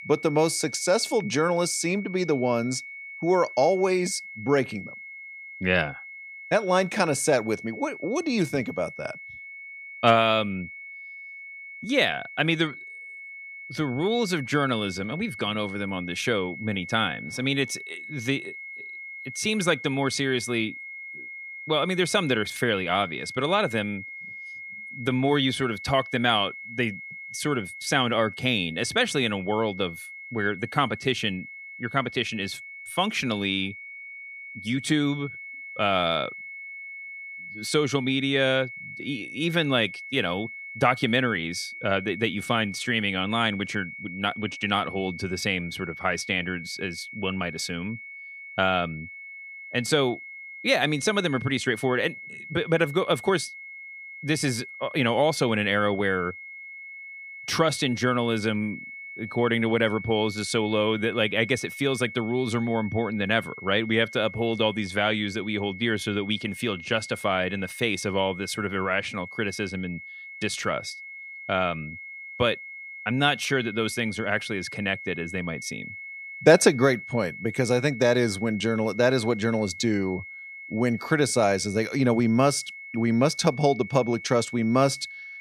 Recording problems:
high-pitched whine; noticeable; throughout; 2 kHz, 10 dB below the speech

